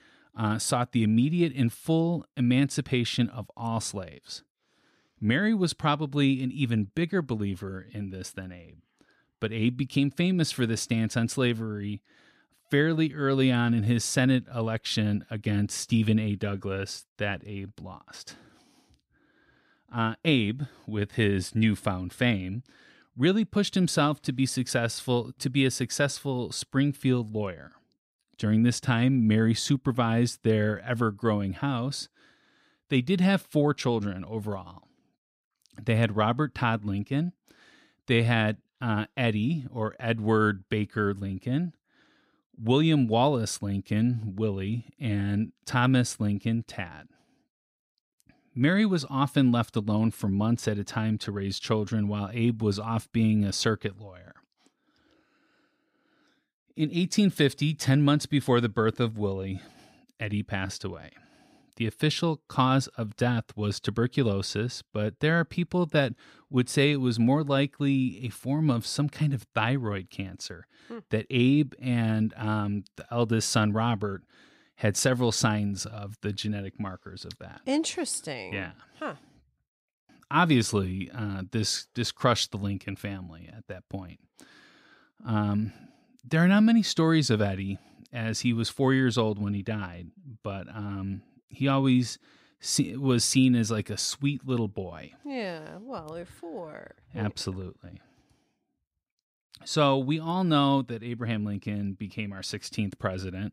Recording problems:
none

